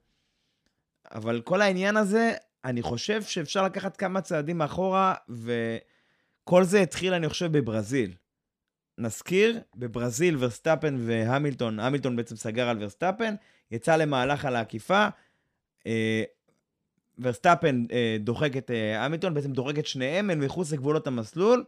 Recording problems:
none

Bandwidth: 15 kHz